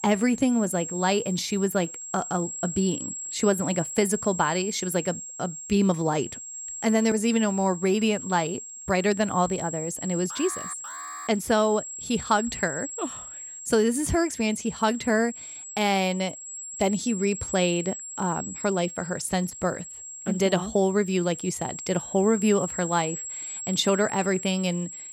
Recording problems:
high-pitched whine; loud; throughout; 7.5 kHz, 9 dB below the speech
alarm; faint; at 10 s; peak 10 dB below the speech

